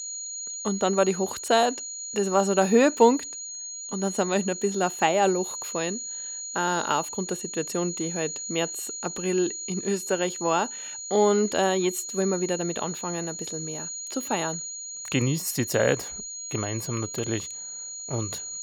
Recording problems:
high-pitched whine; loud; throughout; 7 kHz, 7 dB below the speech

